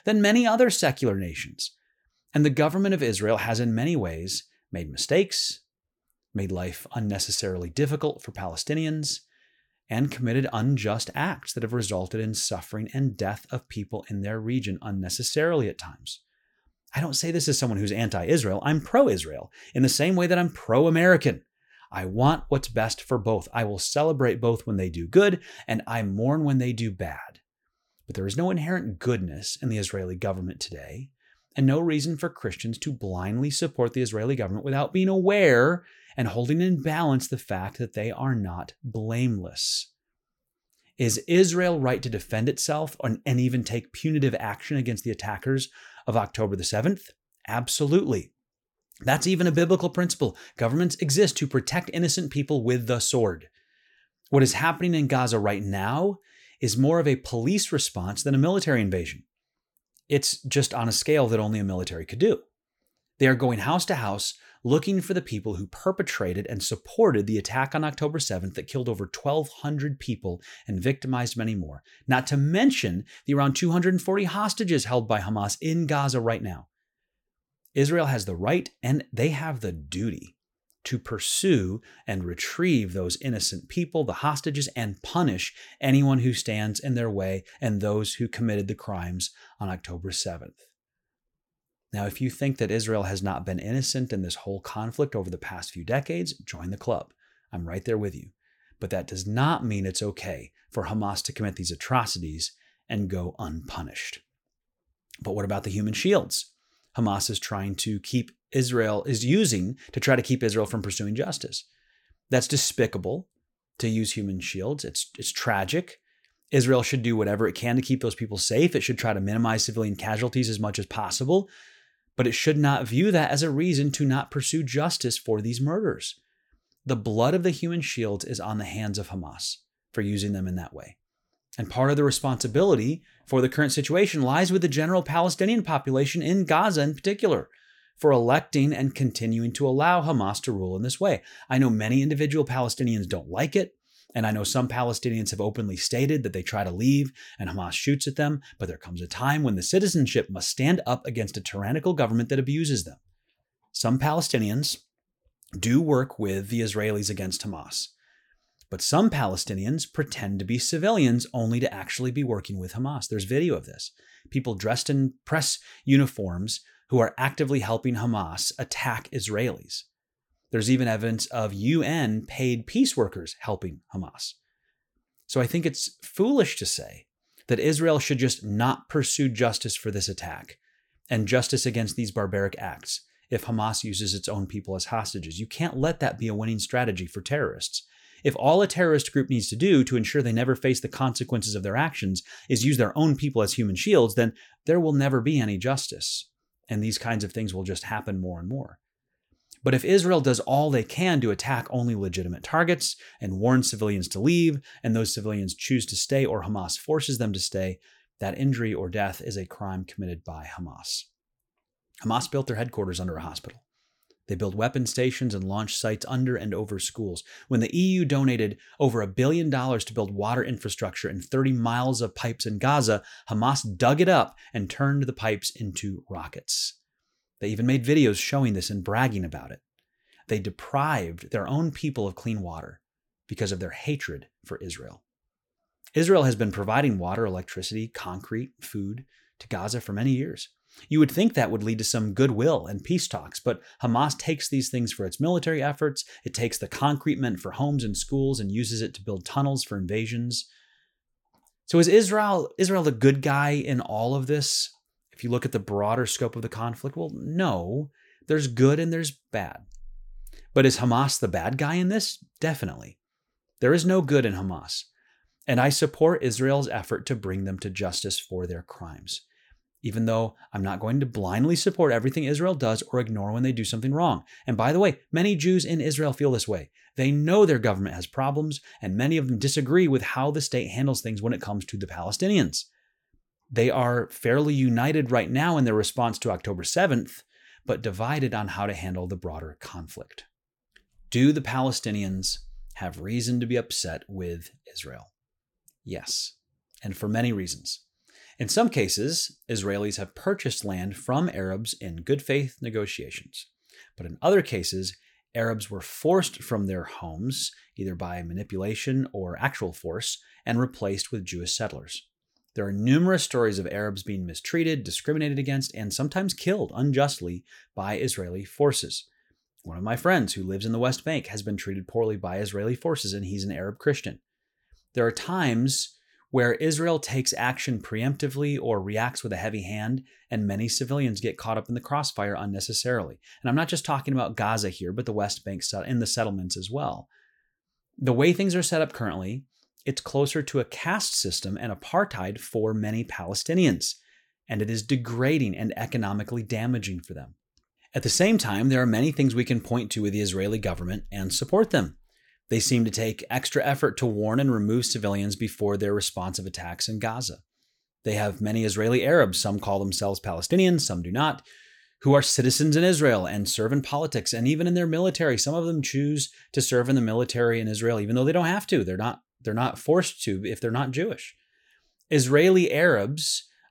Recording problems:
none

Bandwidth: 17 kHz